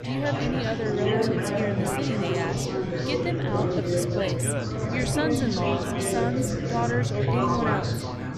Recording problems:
chatter from many people; very loud; throughout; 4 dB above the speech

